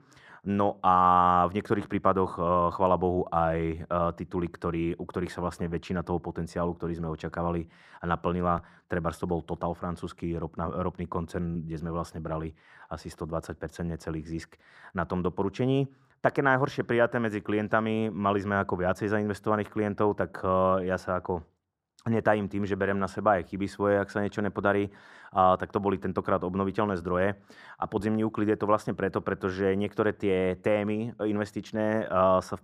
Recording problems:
muffled; very; fading above 2.5 kHz

